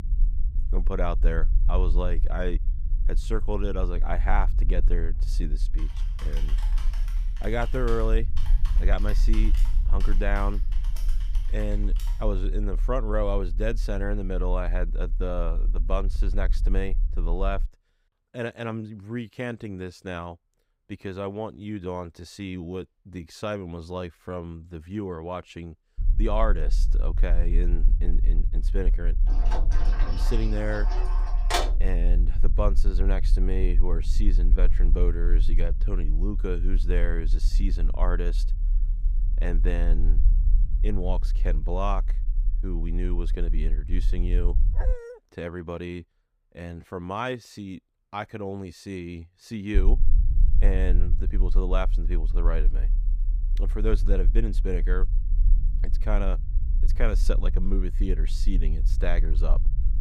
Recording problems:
low rumble; noticeable; until 18 s, from 26 to 45 s and from 50 s on; 15 dB below the speech
keyboard typing; faint; from 5 to 12 s; peak 10 dB below the speech
door banging; loud; from 29 to 32 s; peak 6 dB above the speech
dog barking; noticeable; at 45 s; peak 5 dB below the speech

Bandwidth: 15.5 kHz